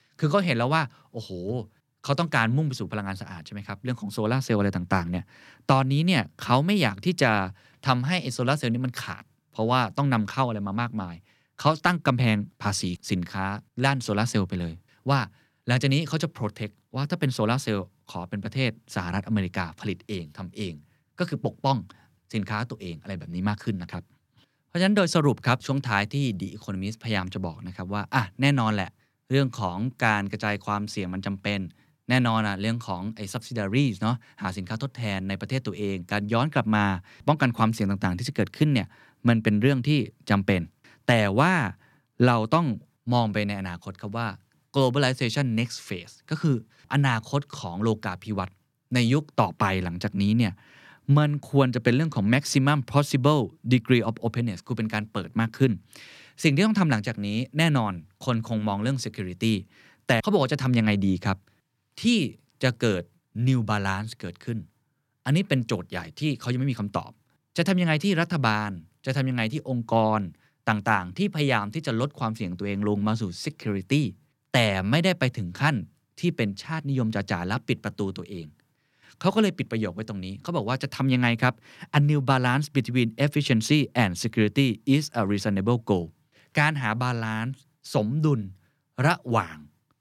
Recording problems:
none

